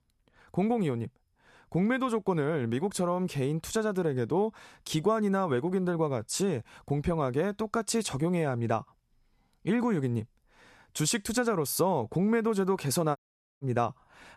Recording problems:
audio cutting out; at 13 s

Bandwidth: 13.5 kHz